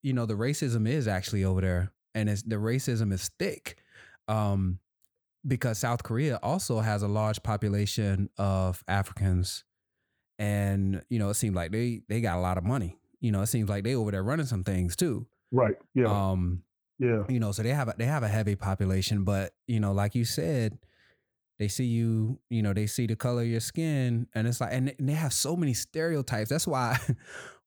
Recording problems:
none

